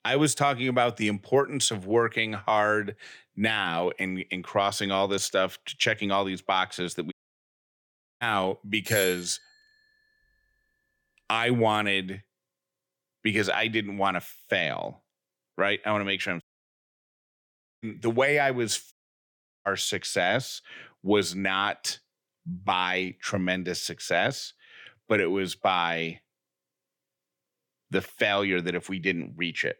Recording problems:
audio cutting out; at 7 s for 1 s, at 16 s for 1.5 s and at 19 s for 0.5 s
doorbell; noticeable; at 9 s; peak 5 dB below the speech

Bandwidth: 18 kHz